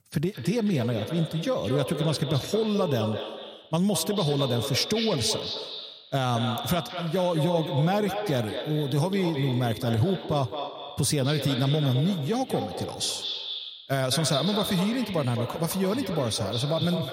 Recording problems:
echo of what is said; strong; throughout; 210 ms later, 7 dB below the speech

